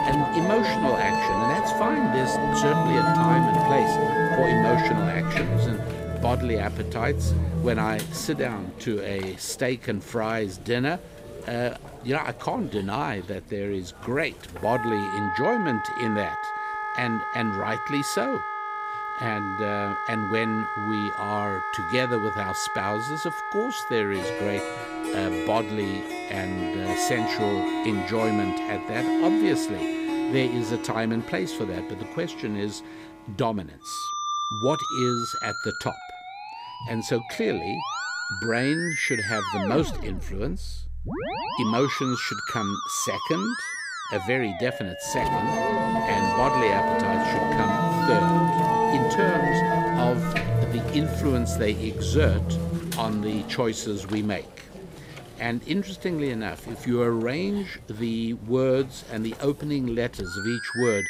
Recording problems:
background music; very loud; throughout; 2 dB above the speech

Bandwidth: 15.5 kHz